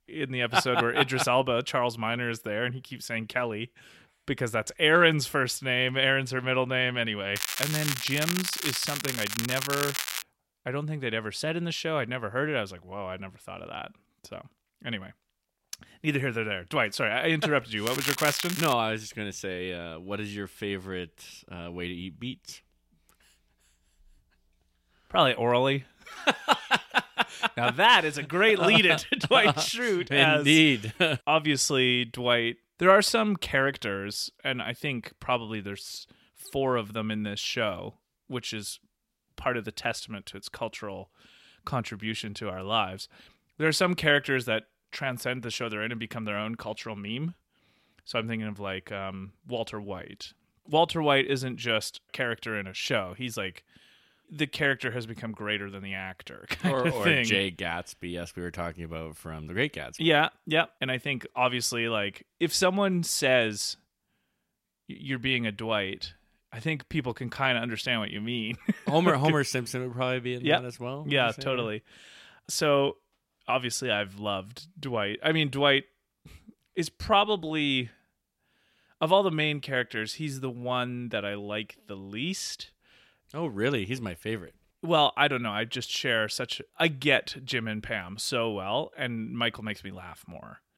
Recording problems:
crackling; loud; from 7.5 to 10 s and at 18 s; 3 dB below the speech

